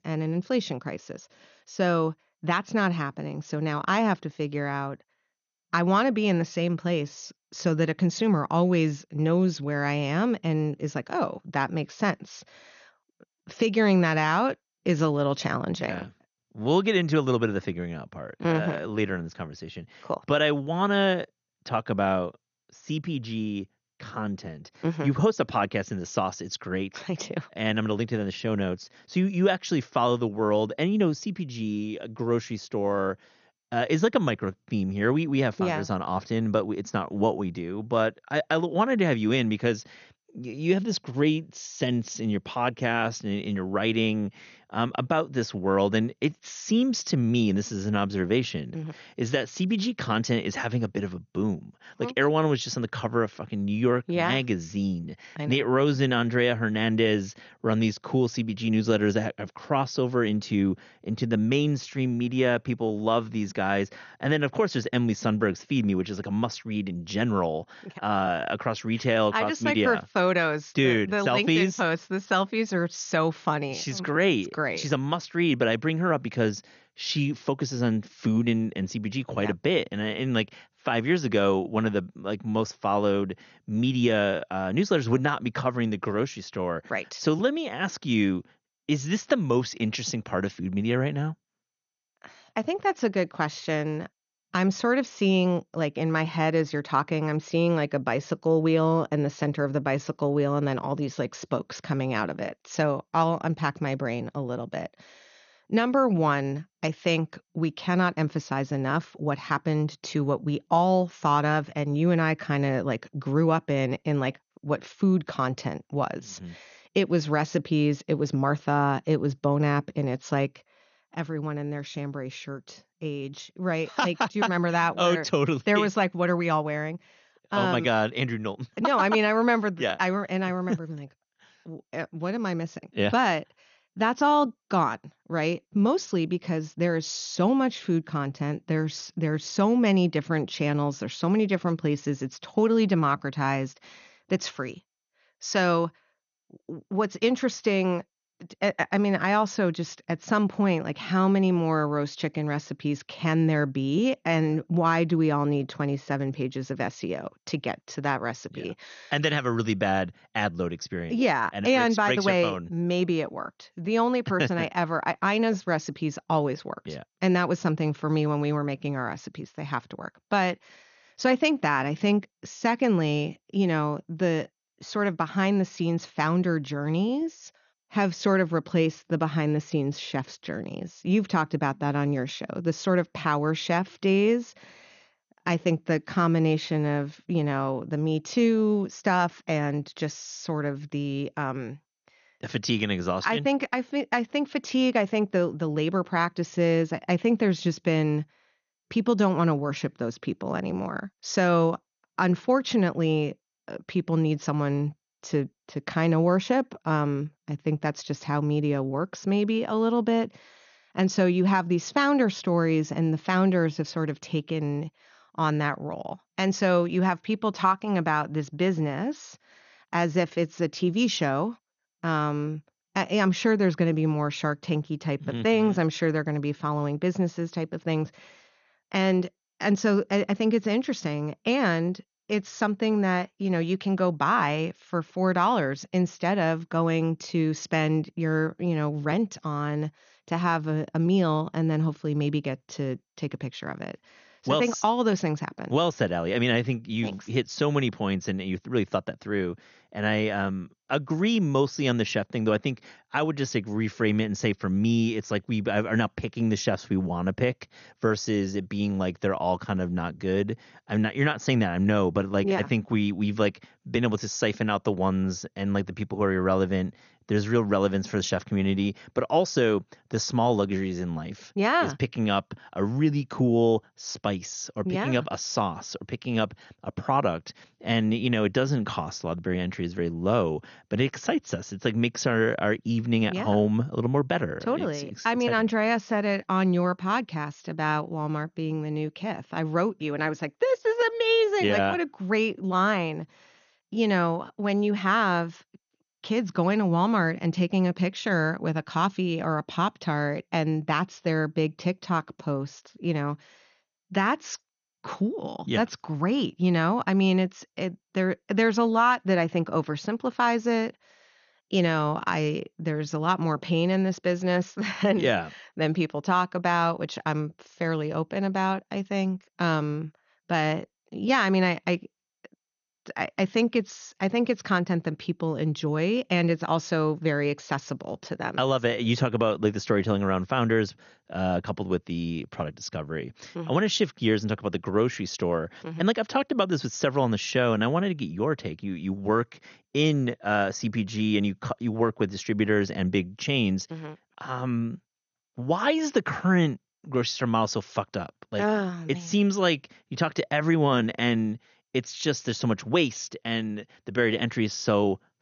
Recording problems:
garbled, watery; slightly; nothing above 6.5 kHz

